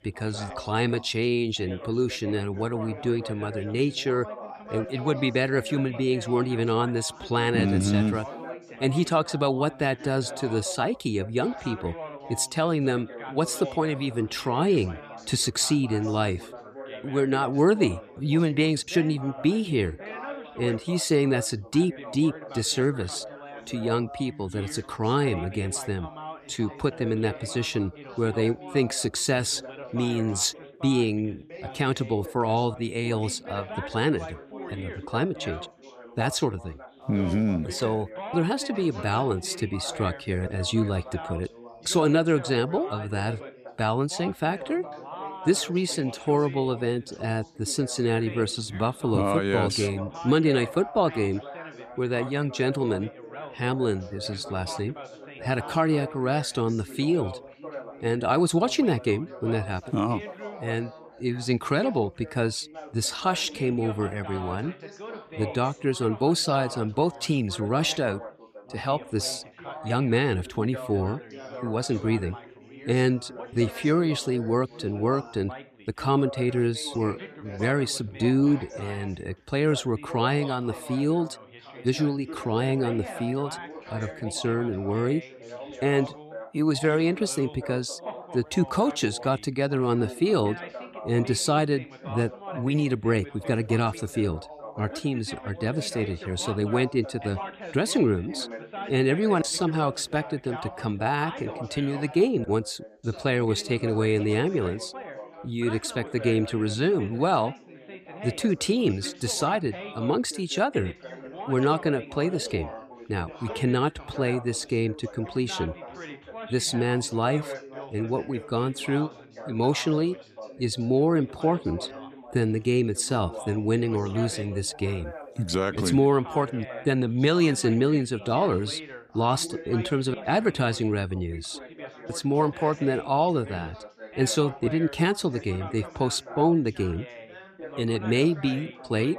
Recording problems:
background chatter; noticeable; throughout; 3 voices, 15 dB below the speech

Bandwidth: 15 kHz